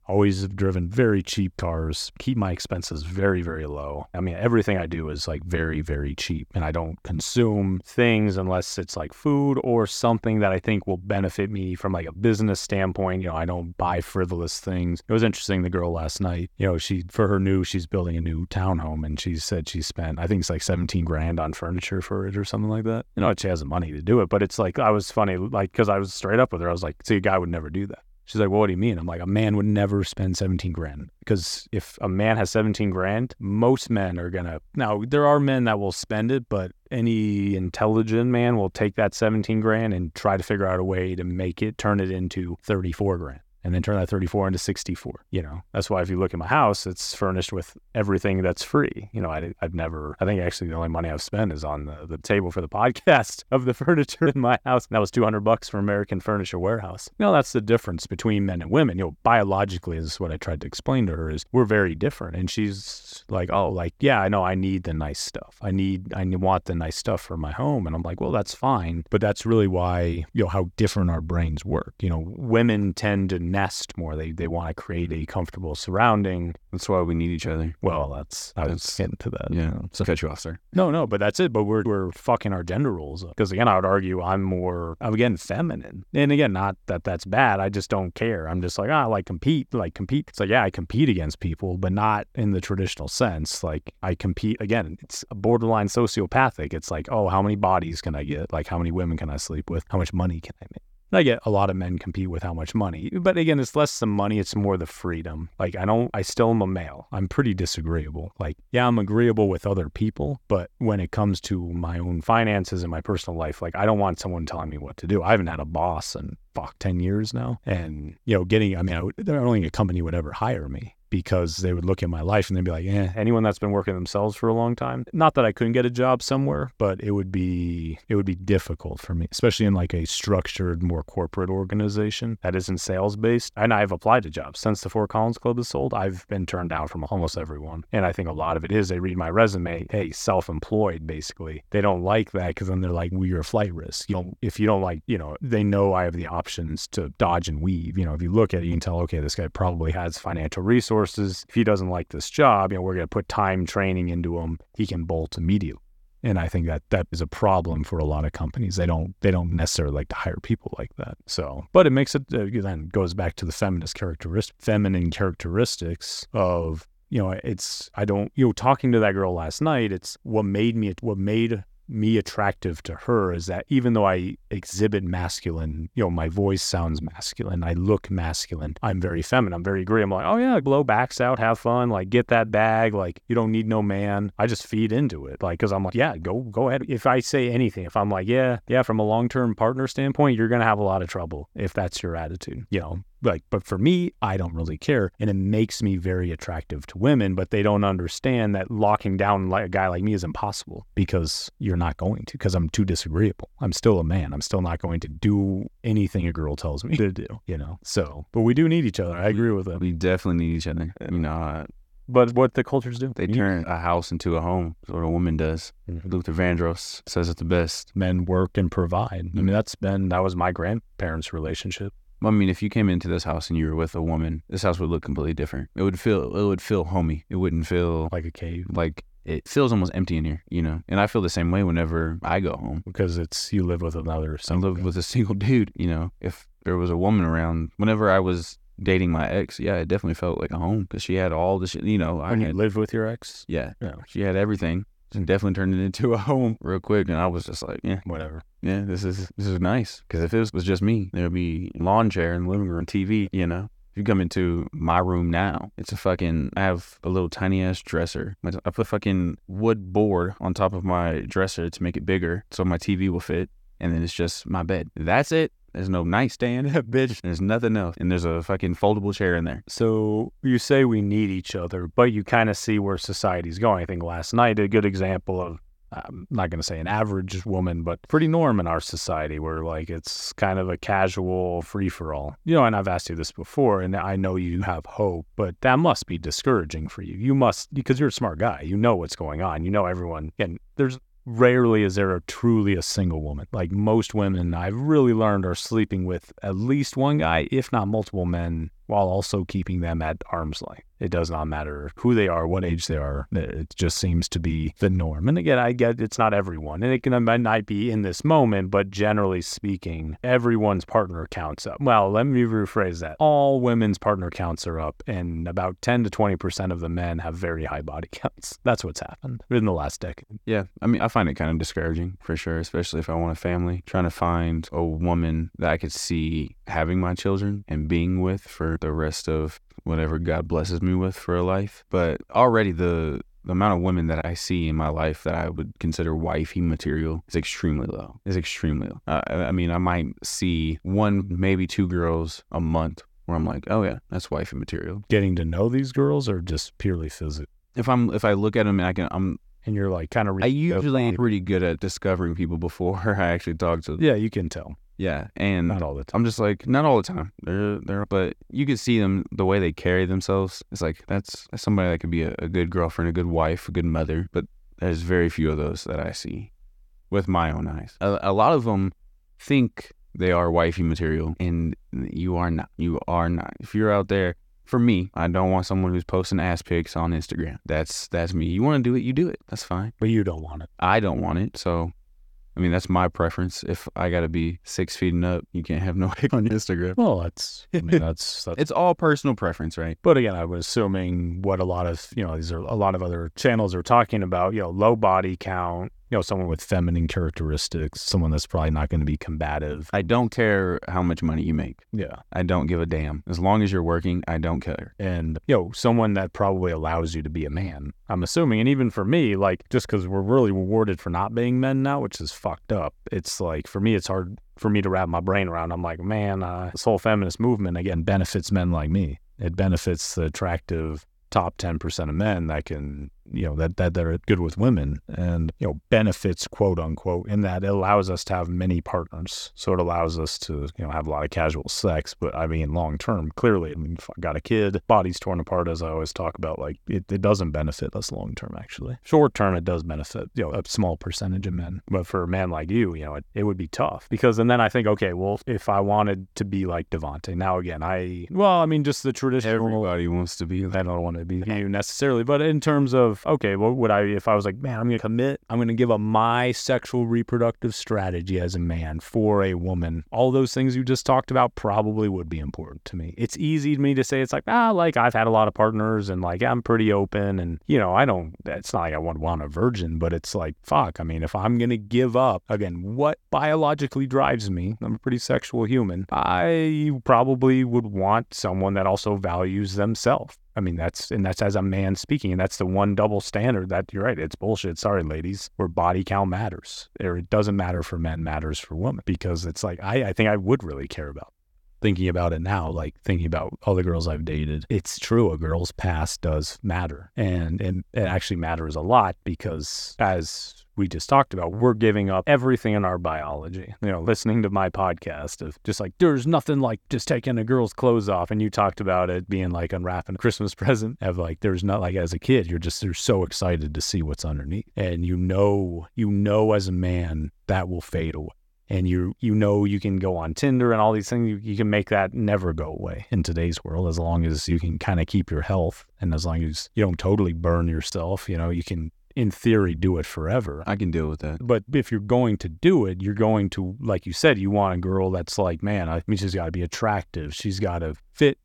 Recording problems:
none

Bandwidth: 17.5 kHz